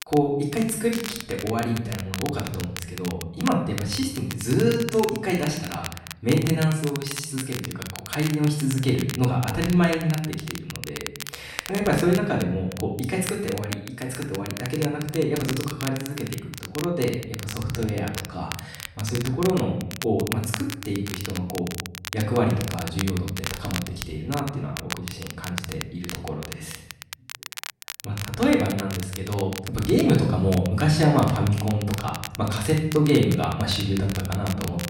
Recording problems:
off-mic speech; far
room echo; noticeable; dies away in 0.7 s
crackle, like an old record; noticeable; 10 dB below the speech

